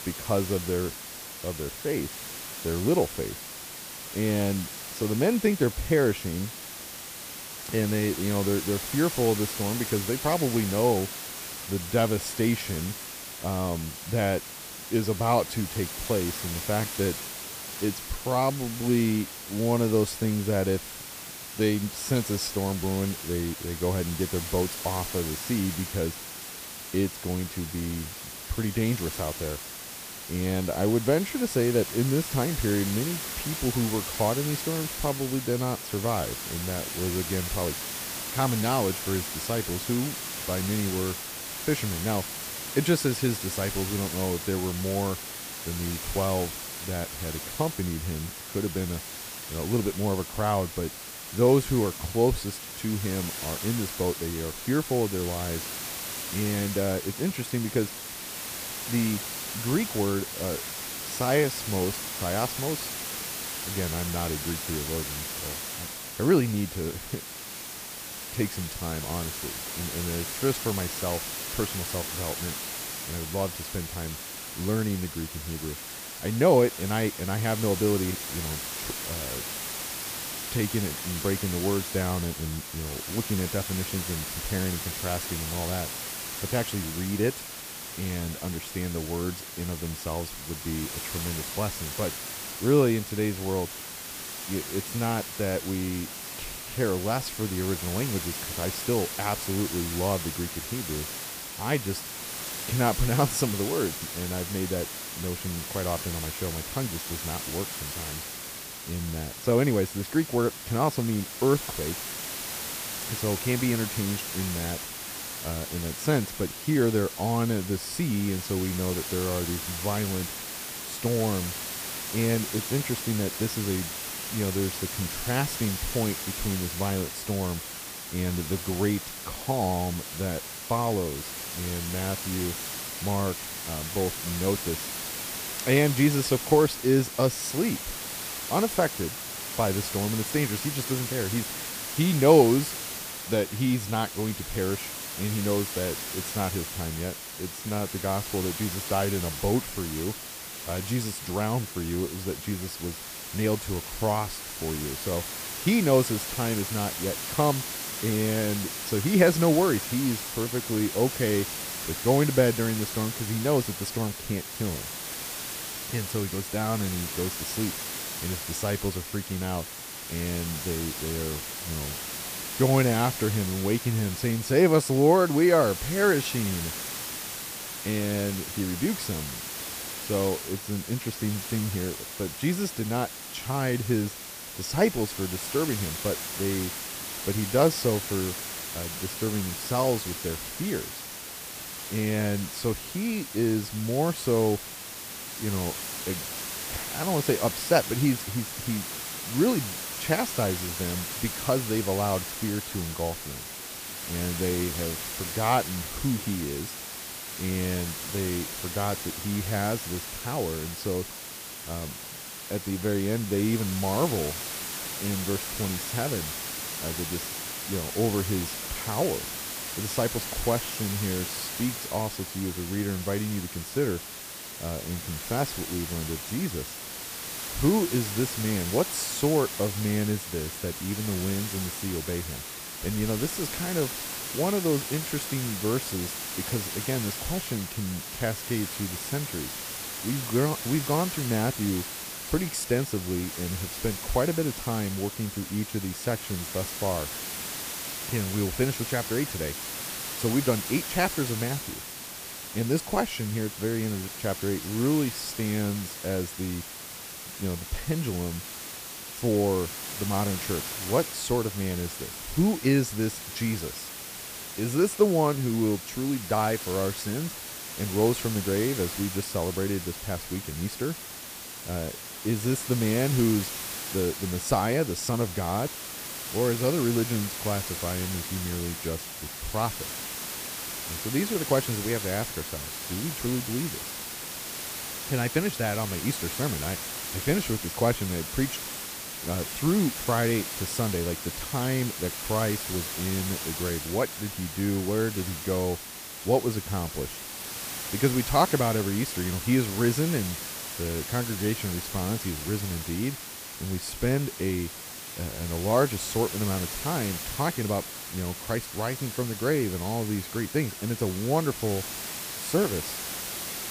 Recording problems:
hiss; loud; throughout; 5 dB below the speech

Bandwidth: 15 kHz